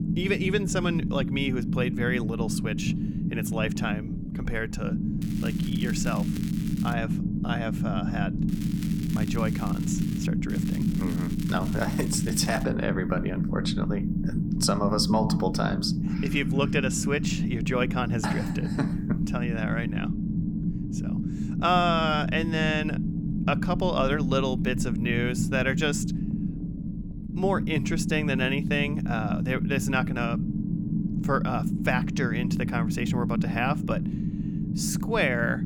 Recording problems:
low rumble; loud; throughout; 7 dB below the speech
crackling; noticeable; from 5 to 7 s, from 8.5 to 10 s and from 11 to 13 s; 15 dB below the speech

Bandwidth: 18 kHz